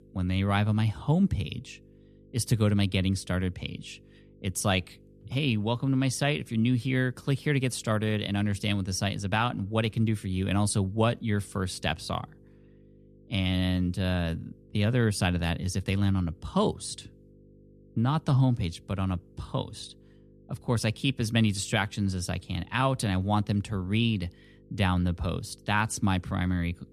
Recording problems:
electrical hum; faint; throughout; 50 Hz, 30 dB below the speech

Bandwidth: 13.5 kHz